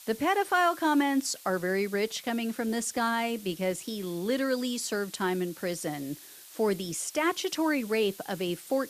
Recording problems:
hiss; noticeable; throughout; 15 dB below the speech

